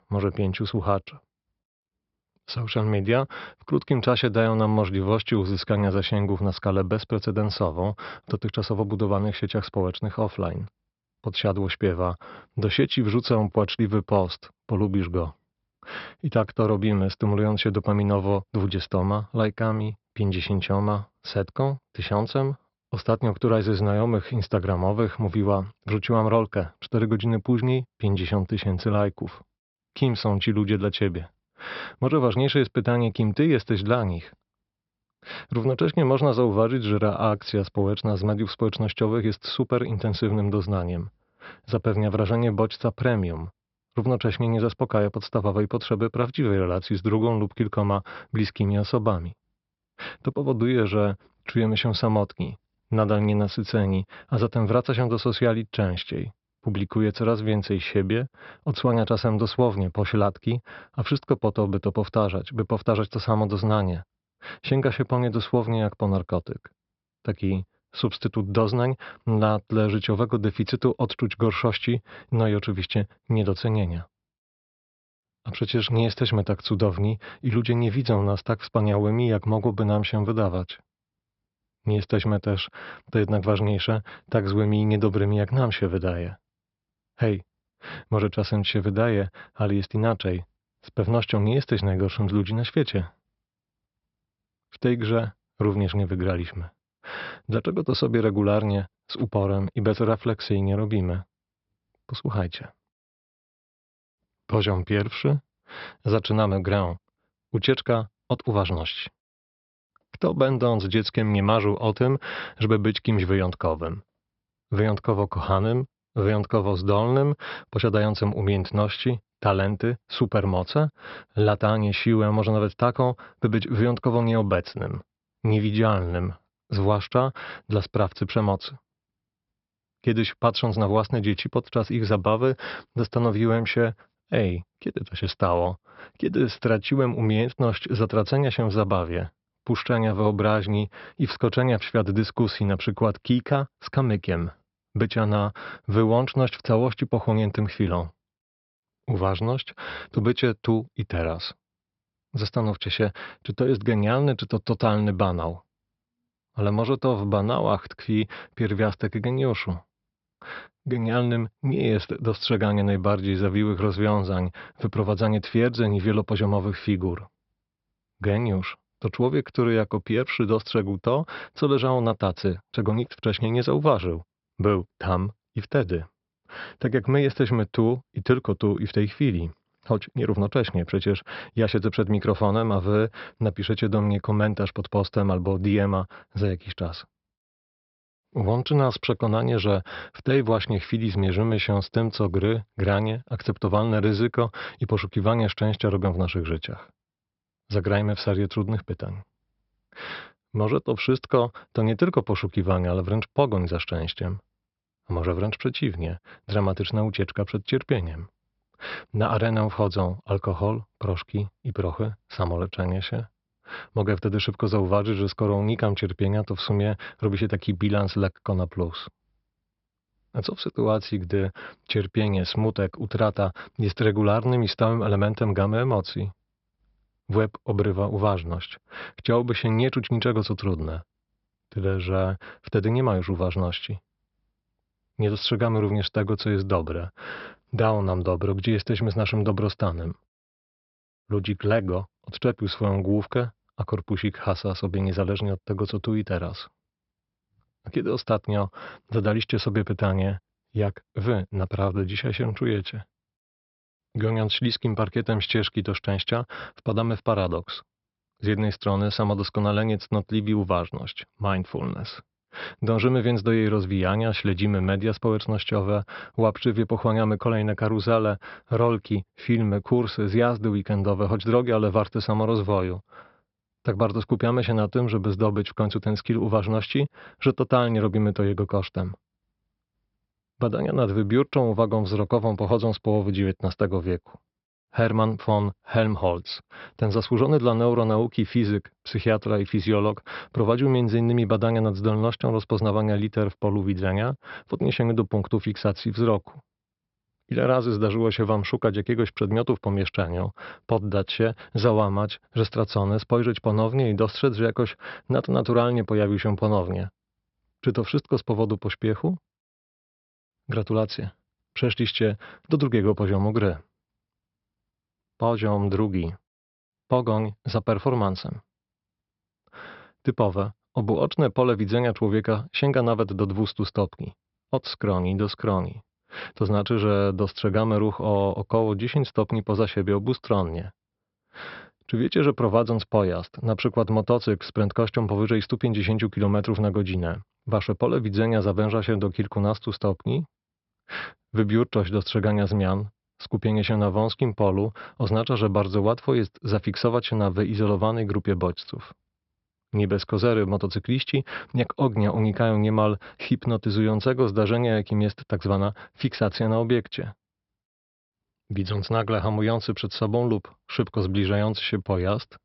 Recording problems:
high frequencies cut off; noticeable; nothing above 5.5 kHz

